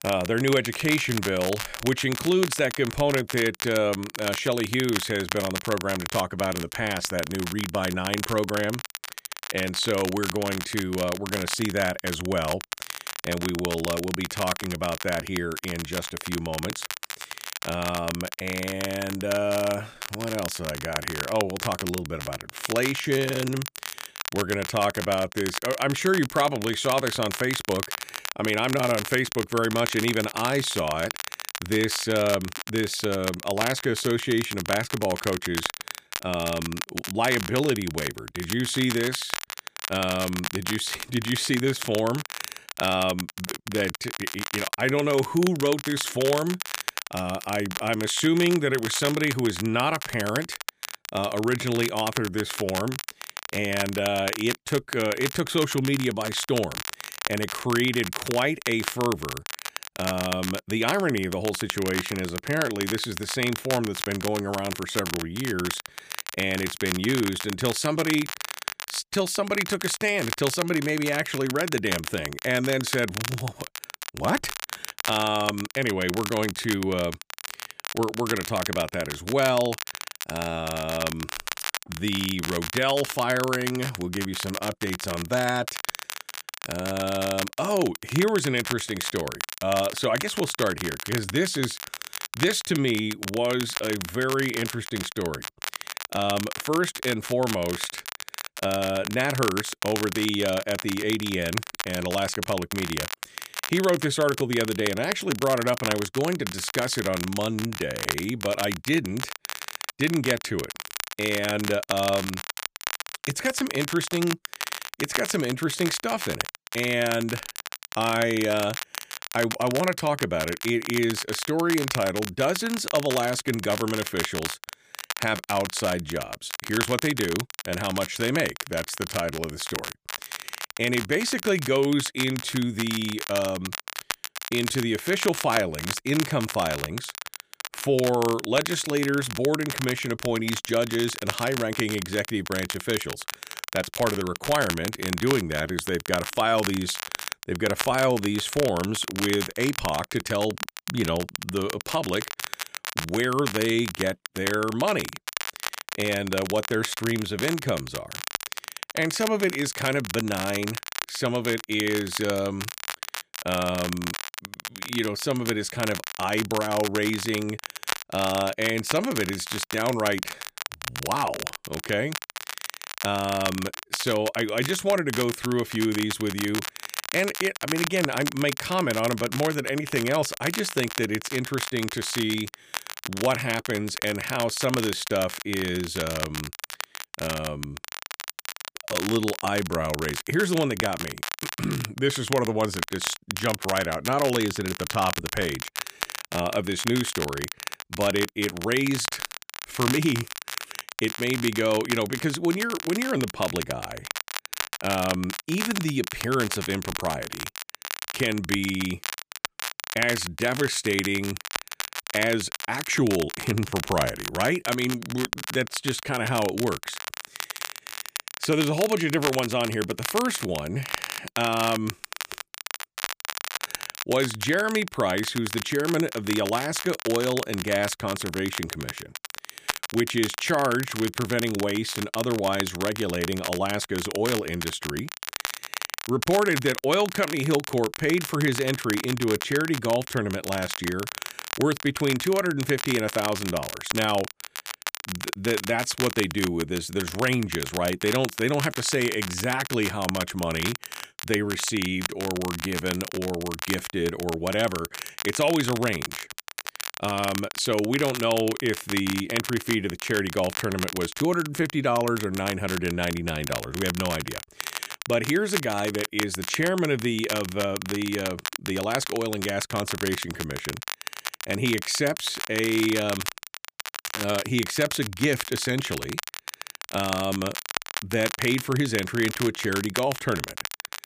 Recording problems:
crackle, like an old record; loud; 6 dB below the speech

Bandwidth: 15 kHz